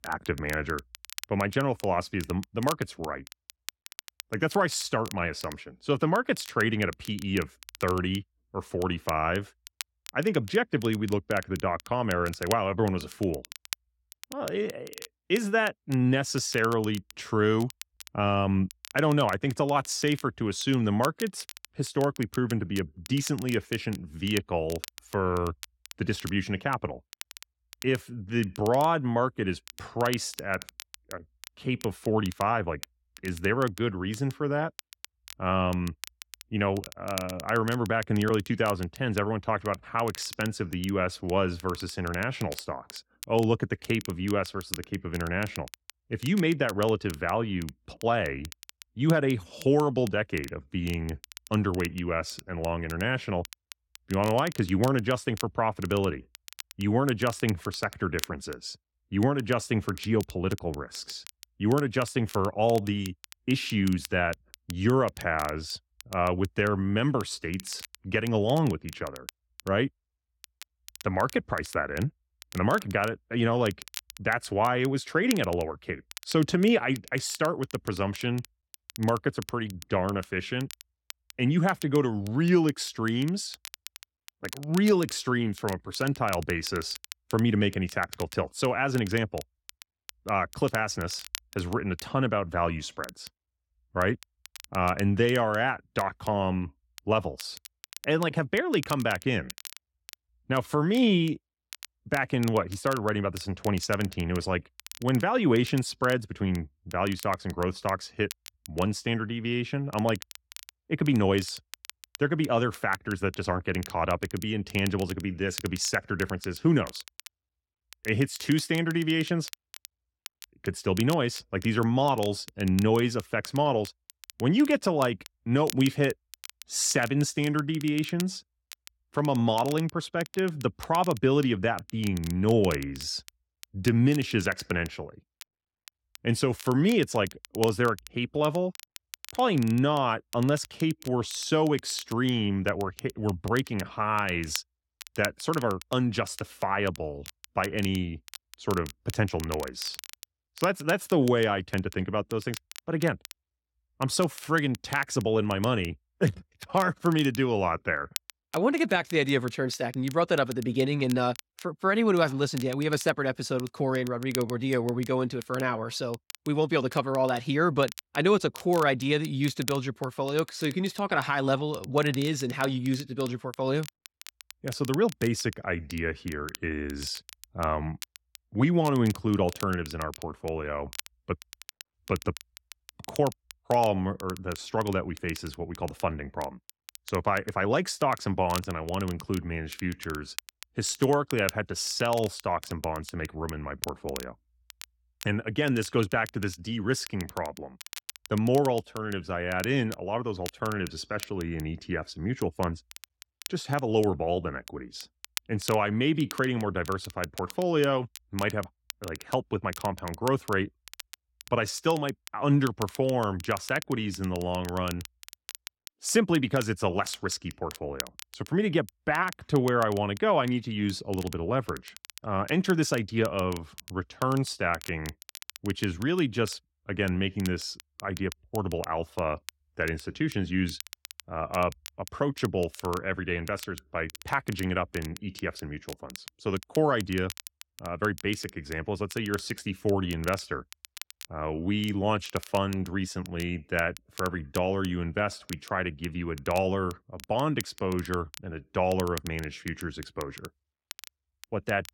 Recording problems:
crackle, like an old record; noticeable; 15 dB below the speech

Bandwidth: 16.5 kHz